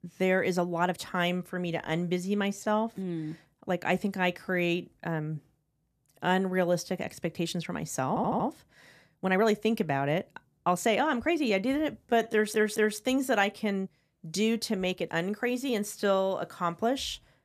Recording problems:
uneven, jittery; strongly; from 0.5 to 16 s
audio stuttering; at 8 s and at 12 s

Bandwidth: 14.5 kHz